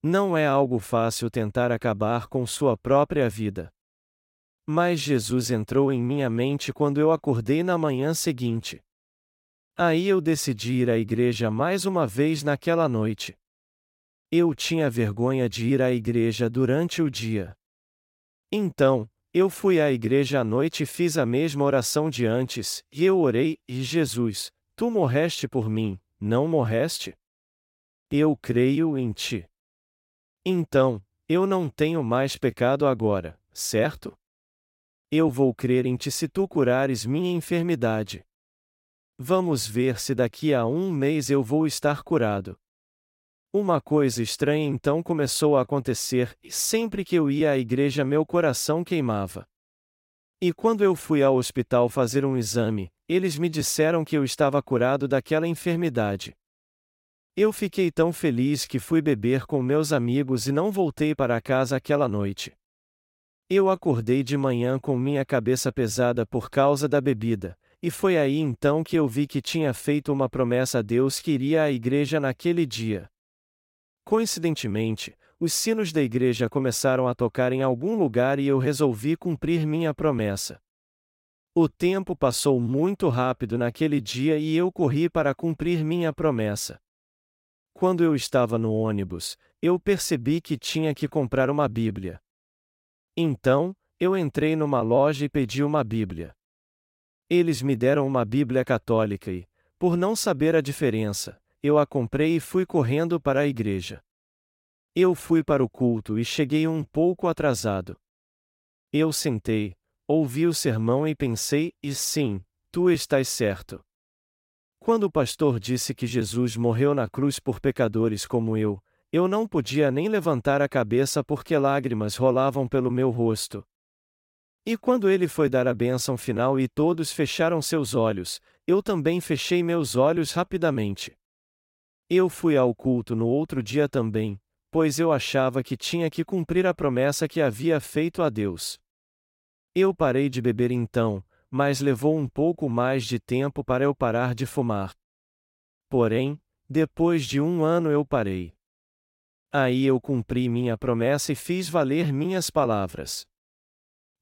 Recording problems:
none

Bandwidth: 16 kHz